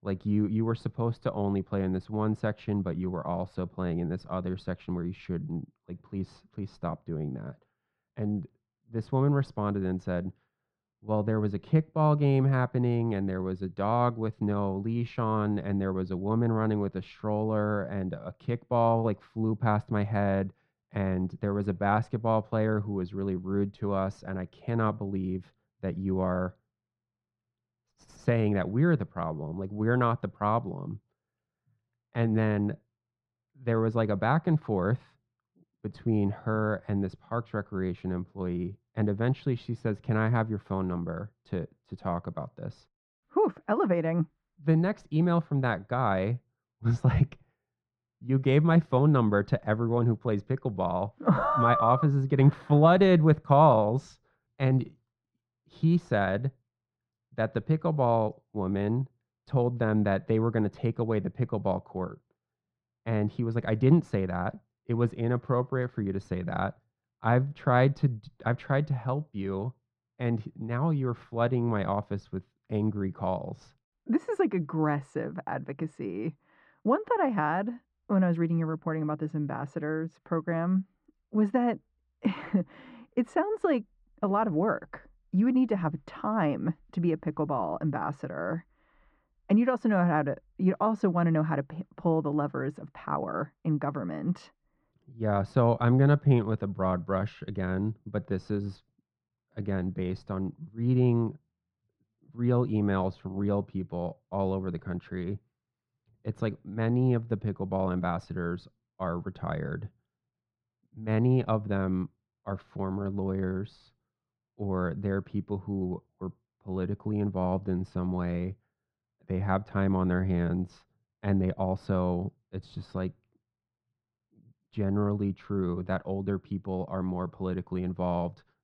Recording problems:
muffled; very; fading above 1.5 kHz

